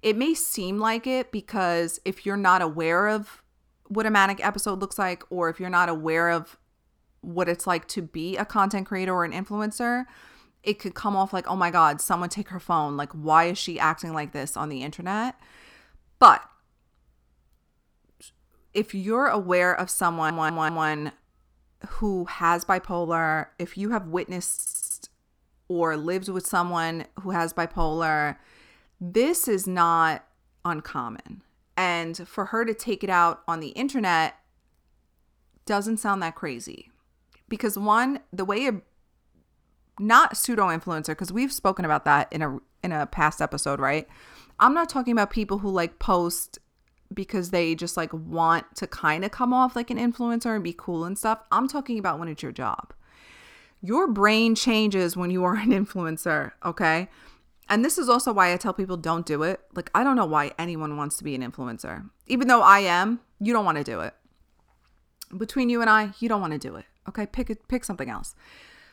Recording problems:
audio stuttering; at 20 s and at 25 s

